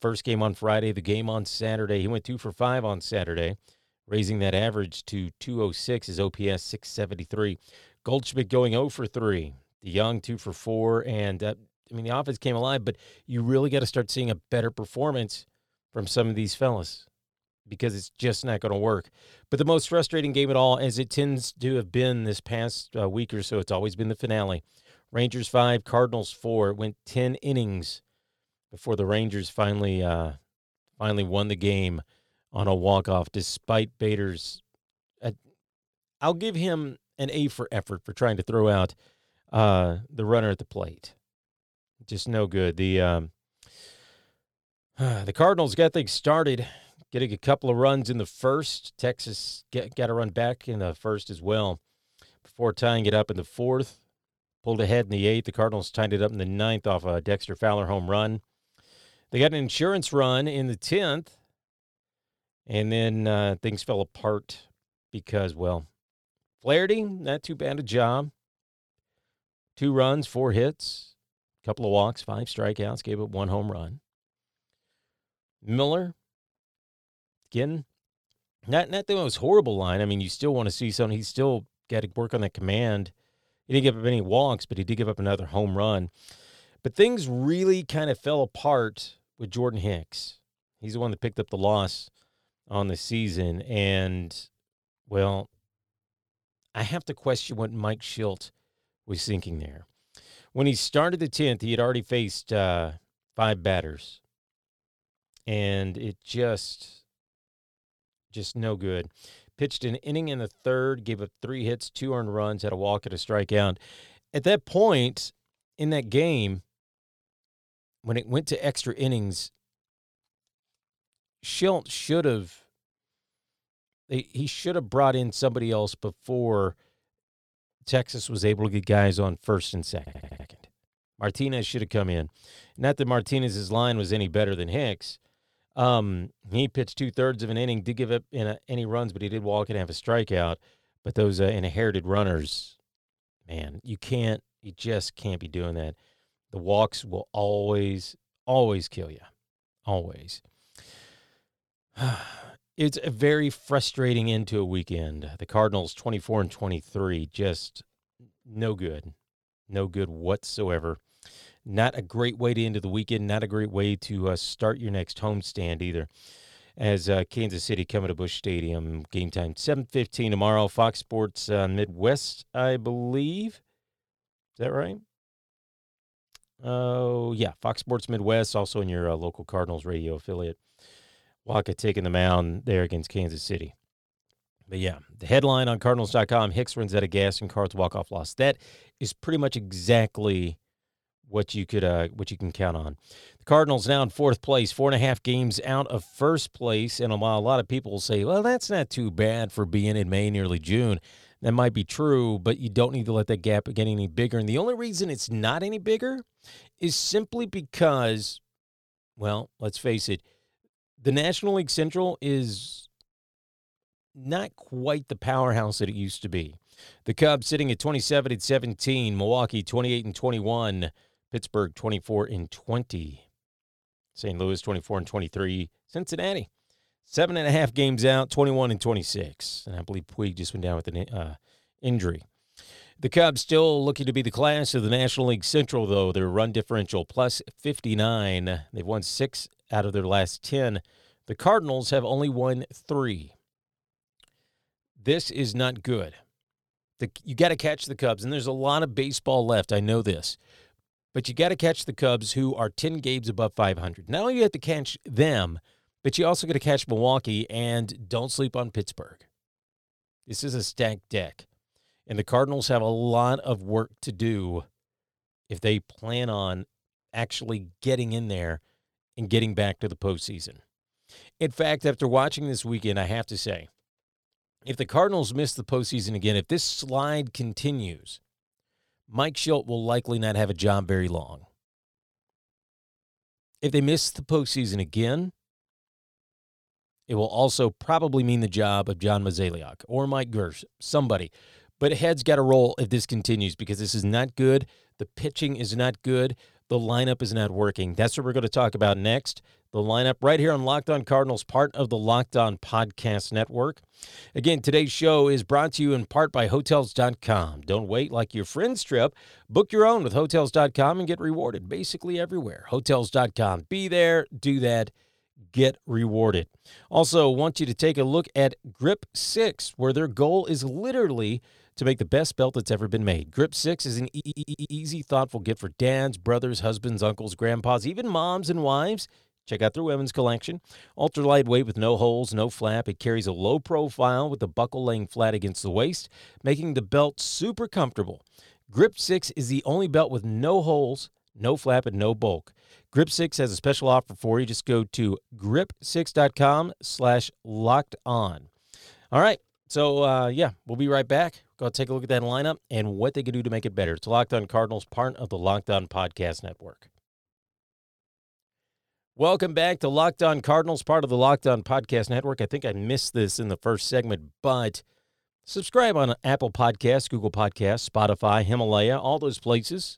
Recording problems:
audio stuttering; at 2:10 and at 5:24

